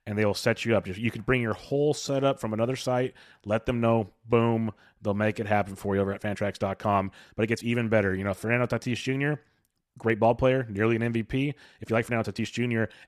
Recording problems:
uneven, jittery; strongly; from 1.5 to 12 s

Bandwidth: 14 kHz